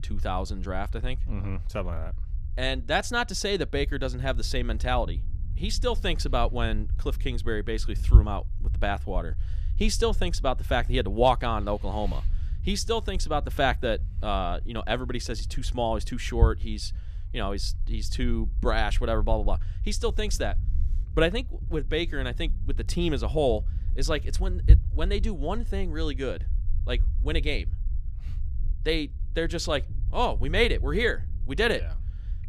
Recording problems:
low rumble; faint; throughout; 20 dB below the speech

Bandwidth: 14.5 kHz